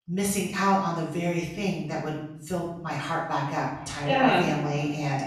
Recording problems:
off-mic speech; far
echo of what is said; noticeable; from 3 s on; 440 ms later, 15 dB below the speech
room echo; noticeable; dies away in 0.8 s

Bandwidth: 13.5 kHz